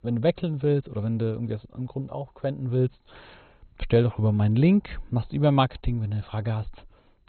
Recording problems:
garbled, watery; badly; nothing above 4 kHz

